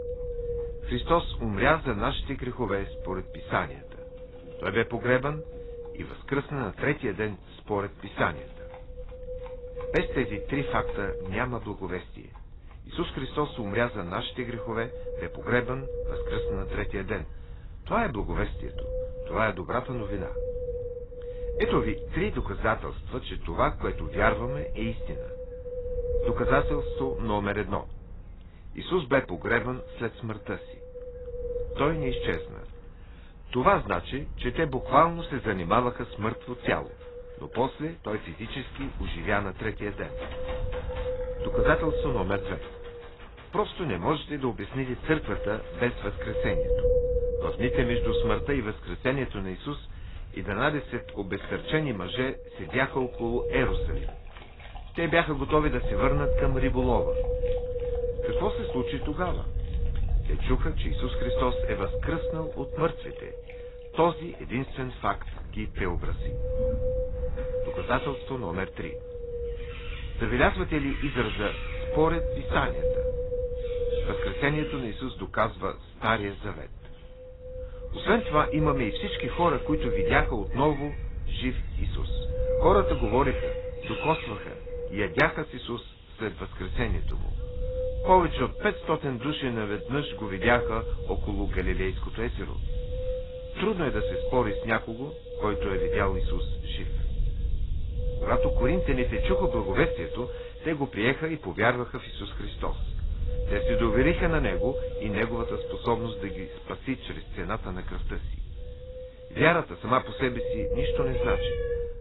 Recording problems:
garbled, watery; badly; nothing above 4 kHz
wind noise on the microphone; heavy; 6 dB below the speech
animal sounds; faint; throughout; 20 dB below the speech

